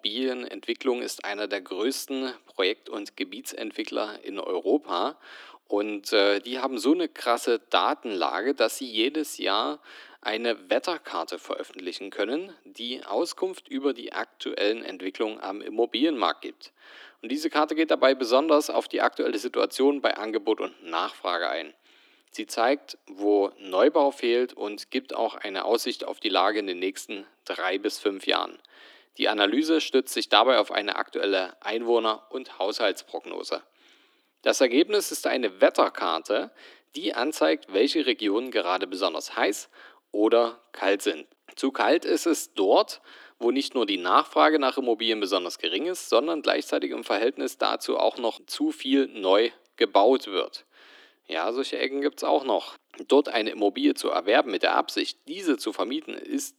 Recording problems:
thin; somewhat; fading below 300 Hz

